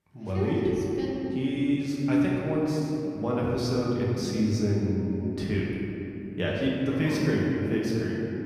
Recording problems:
room echo; strong; dies away in 3 s
off-mic speech; far

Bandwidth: 14.5 kHz